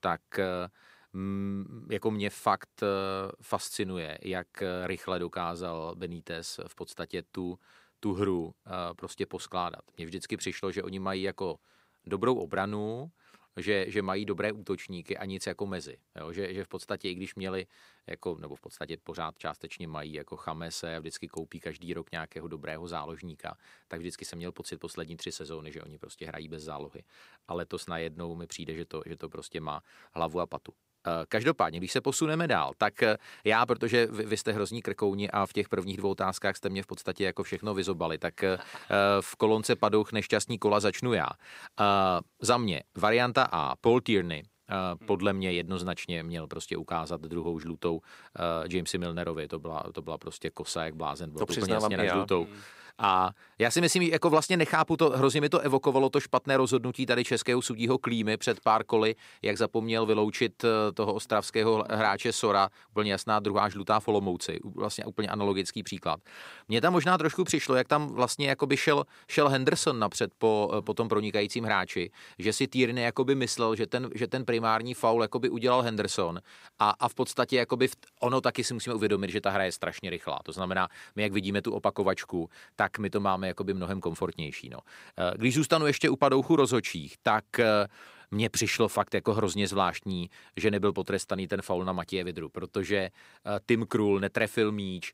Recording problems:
none

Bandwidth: 15.5 kHz